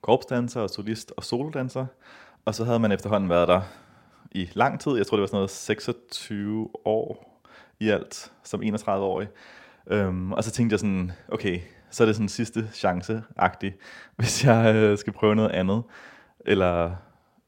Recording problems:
none

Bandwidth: 16.5 kHz